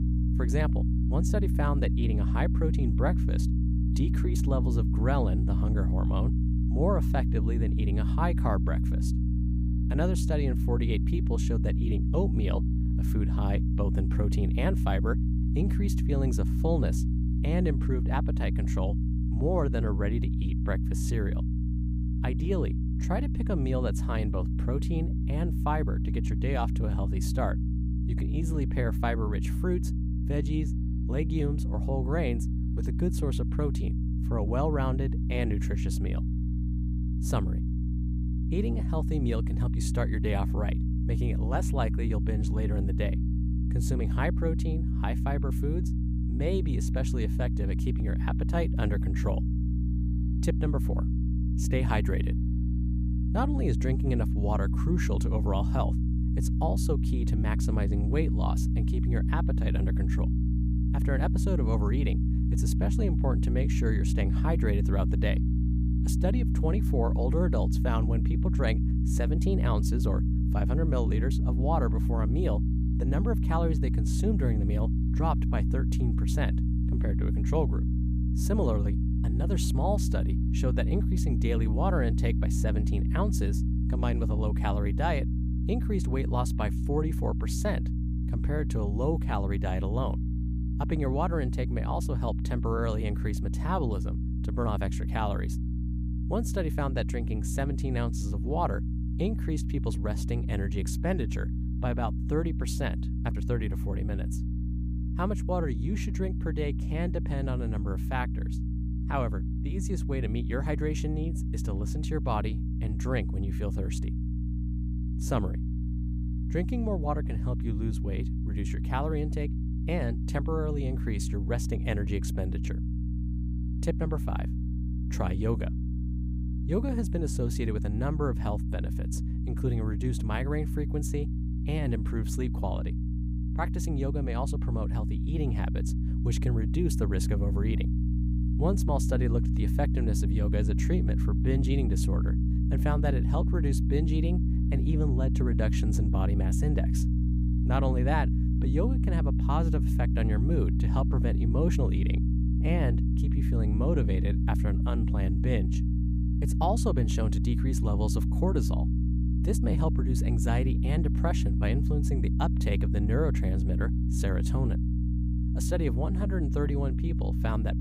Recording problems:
electrical hum; loud; throughout; 60 Hz, 5 dB below the speech

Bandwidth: 15.5 kHz